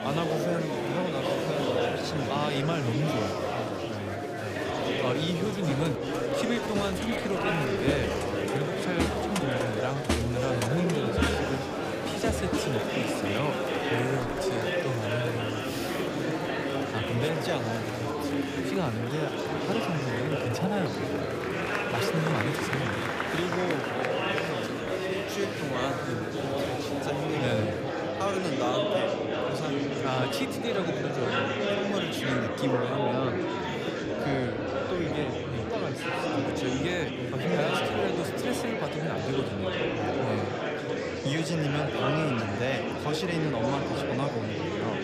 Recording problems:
murmuring crowd; very loud; throughout; 3 dB above the speech

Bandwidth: 15 kHz